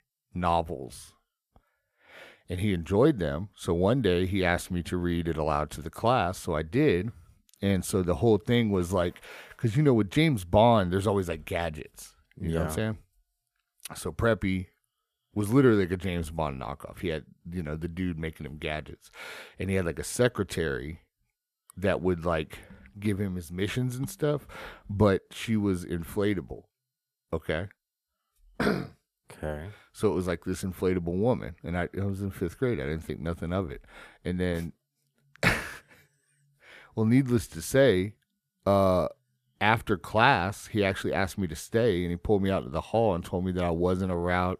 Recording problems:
none

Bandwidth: 14.5 kHz